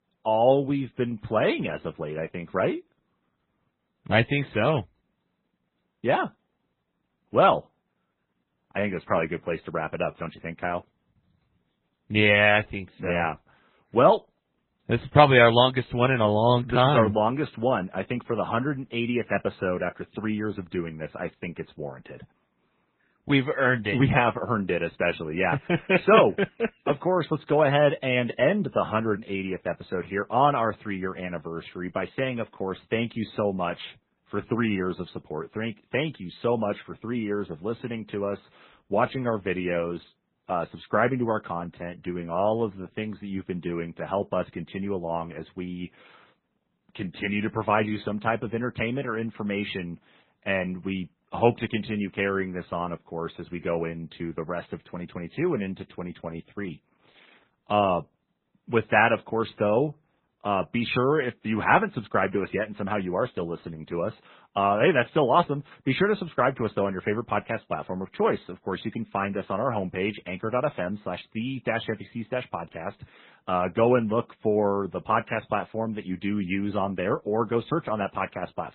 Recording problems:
garbled, watery; badly; nothing above 4 kHz

